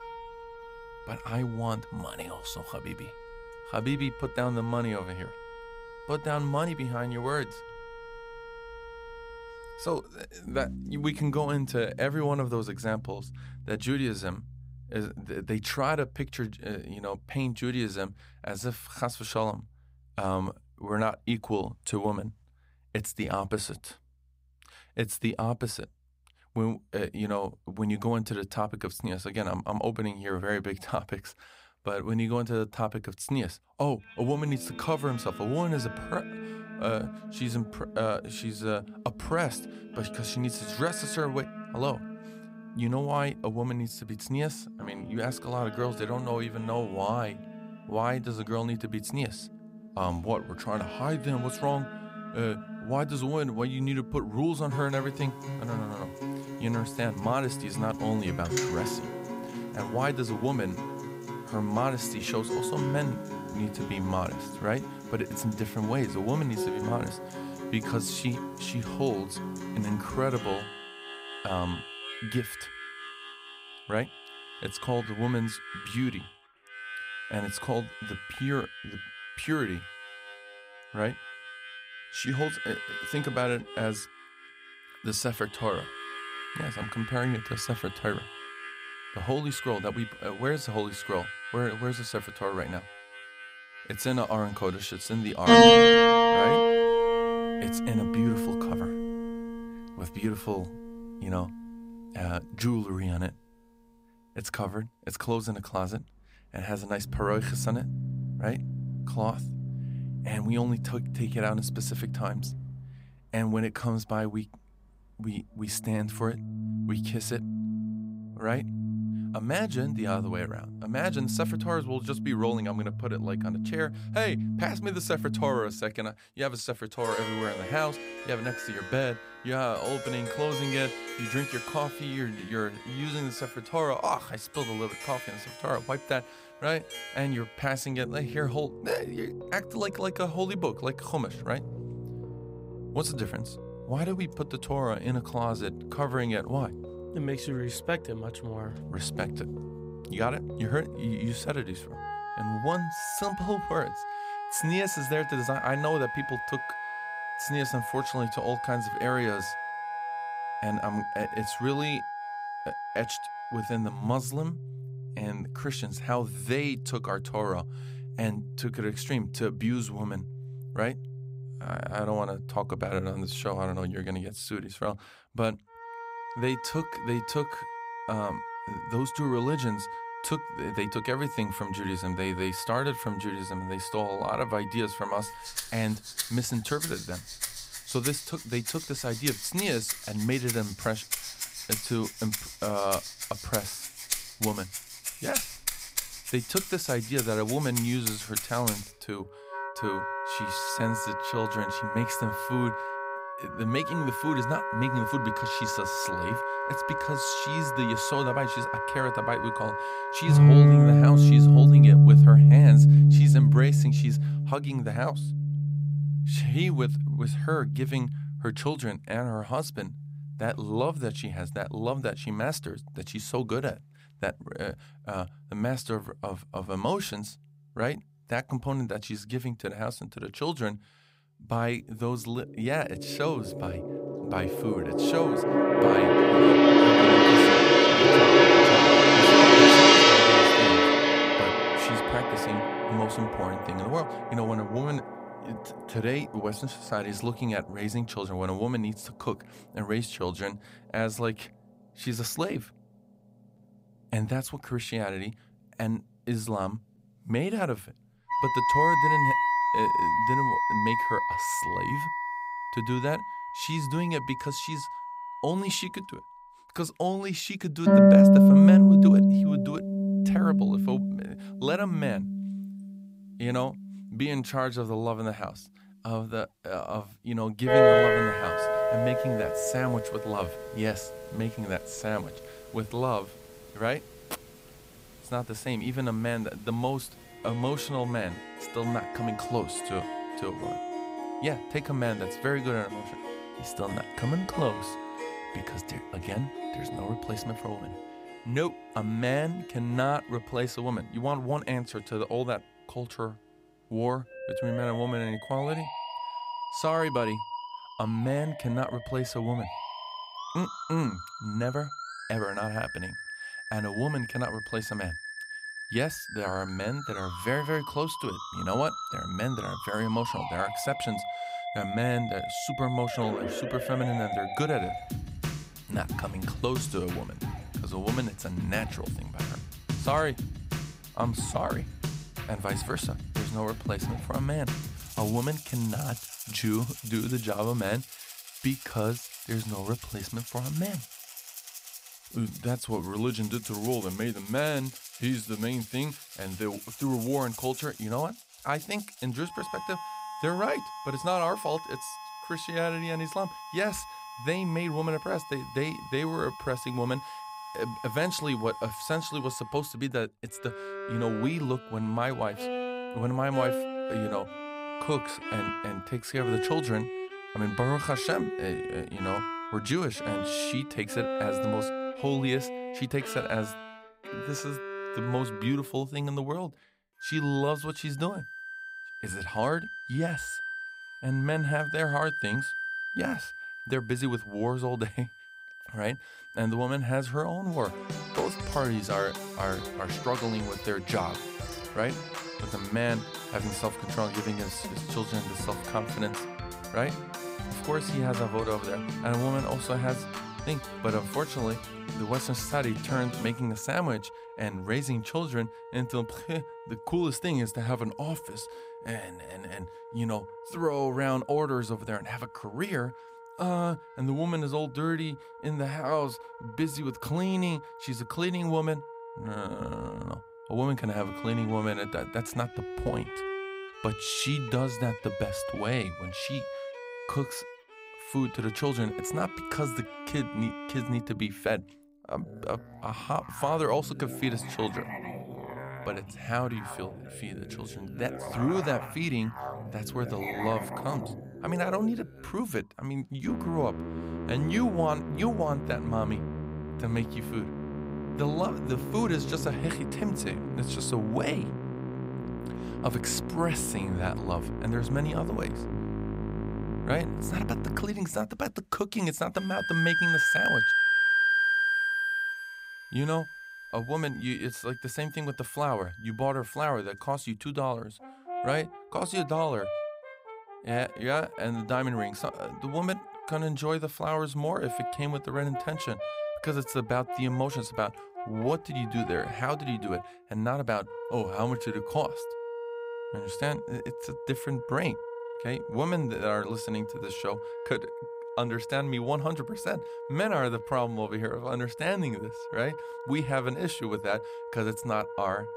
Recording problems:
background music; very loud; throughout; 5 dB above the speech

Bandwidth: 15.5 kHz